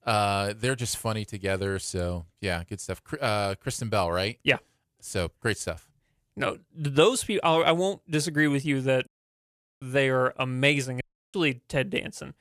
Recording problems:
audio cutting out; at 9 s for 1 s and at 11 s

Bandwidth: 14.5 kHz